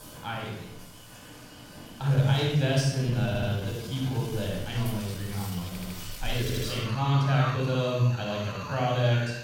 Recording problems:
room echo; strong; dies away in 0.9 s
off-mic speech; far
animal sounds; noticeable; throughout; 15 dB below the speech
uneven, jittery; strongly; from 2 to 9 s
audio stuttering; at 3.5 s, at 5.5 s and at 6.5 s

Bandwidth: 16.5 kHz